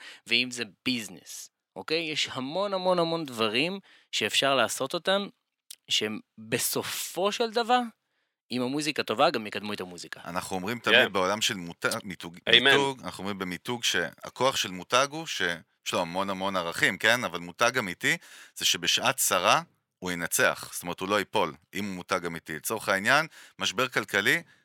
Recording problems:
thin; somewhat; fading below 850 Hz

